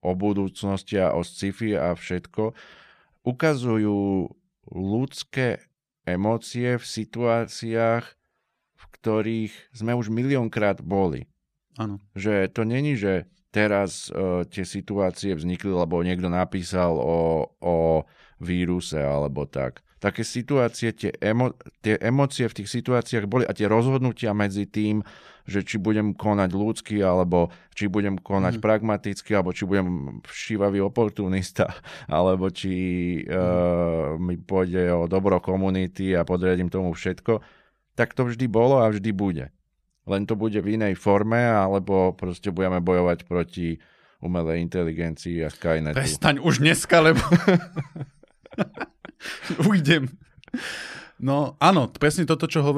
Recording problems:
abrupt cut into speech; at the end

